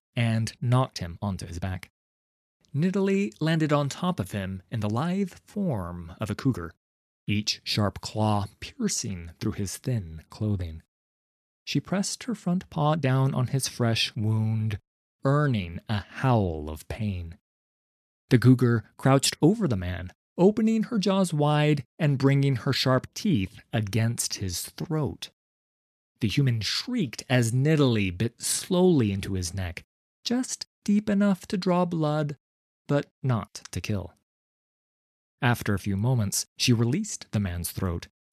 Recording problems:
uneven, jittery; strongly; from 1 to 37 s

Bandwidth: 14 kHz